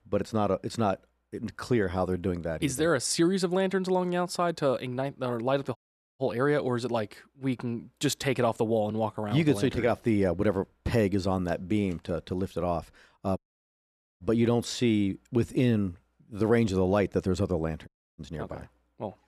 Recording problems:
audio cutting out; at 6 s, at 13 s for 1 s and at 18 s

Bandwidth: 13.5 kHz